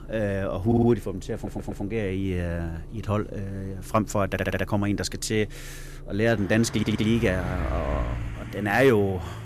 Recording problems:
traffic noise; noticeable; throughout; 10 dB below the speech
audio stuttering; 4 times, first at 0.5 s

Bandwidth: 14.5 kHz